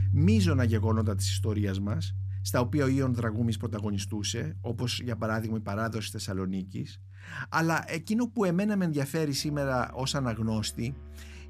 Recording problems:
background music; loud; throughout; 4 dB below the speech

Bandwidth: 14.5 kHz